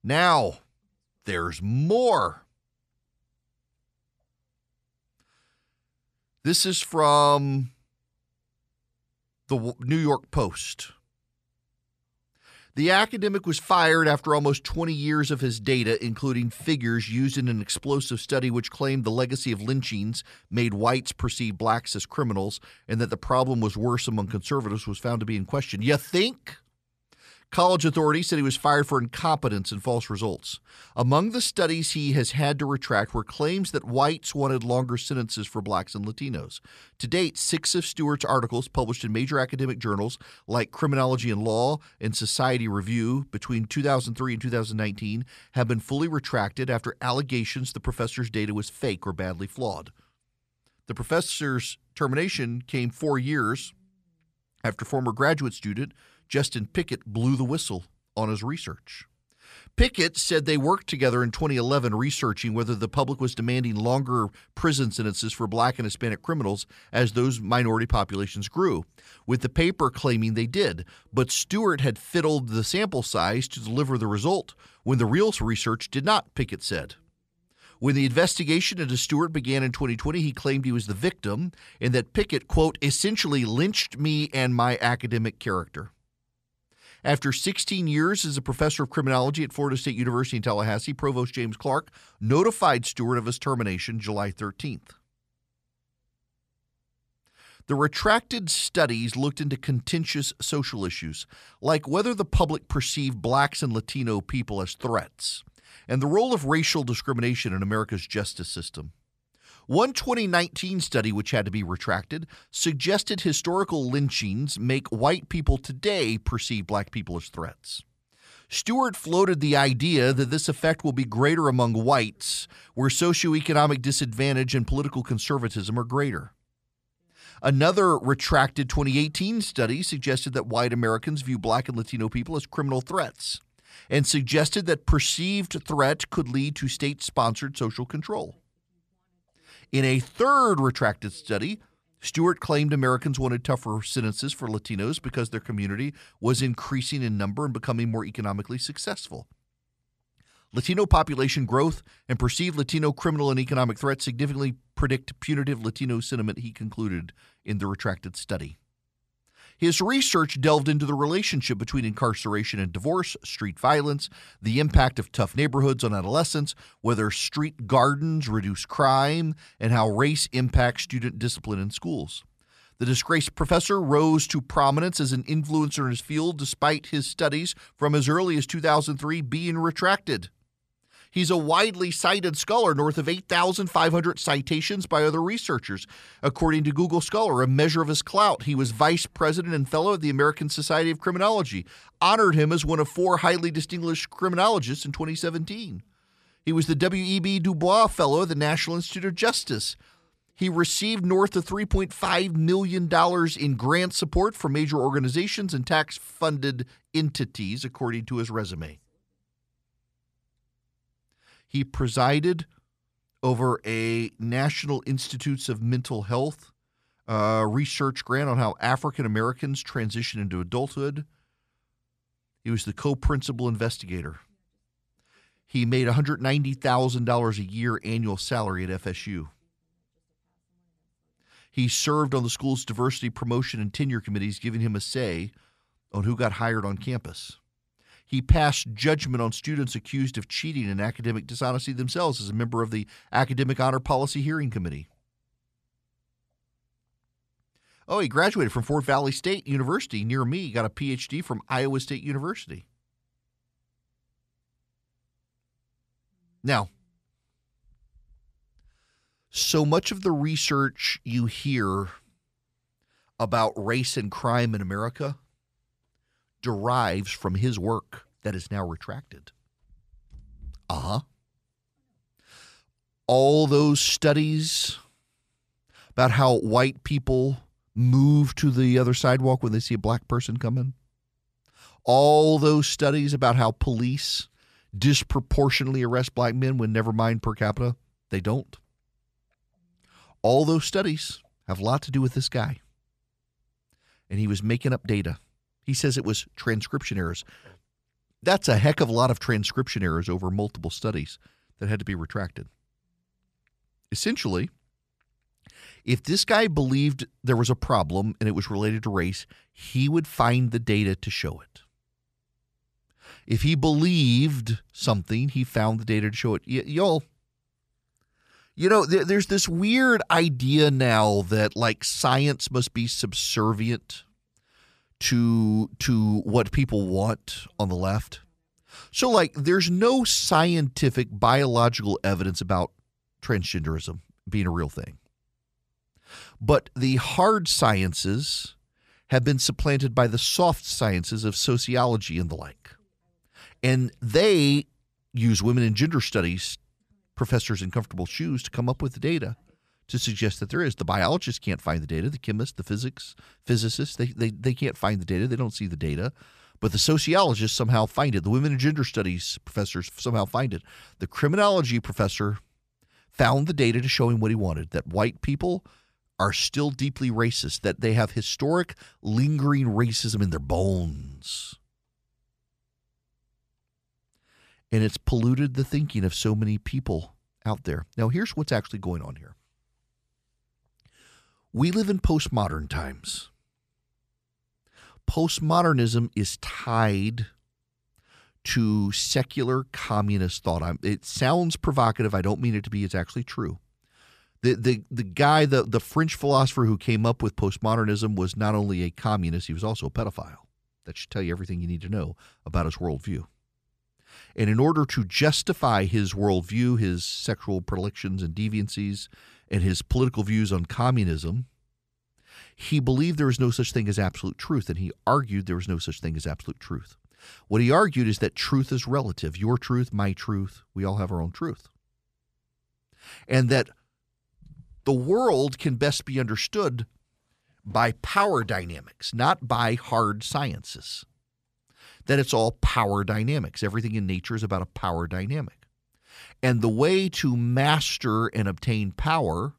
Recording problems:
none

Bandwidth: 14.5 kHz